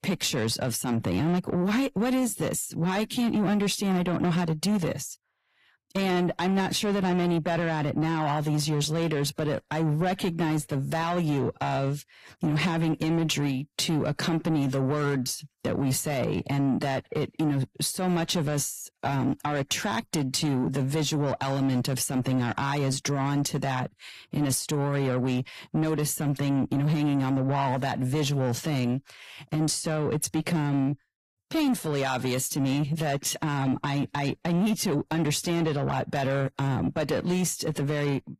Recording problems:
distortion; slight; 10 dB below the speech
garbled, watery; slightly; nothing above 15.5 kHz

